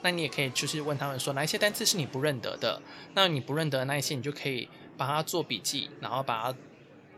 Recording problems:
murmuring crowd; noticeable; throughout; 20 dB below the speech

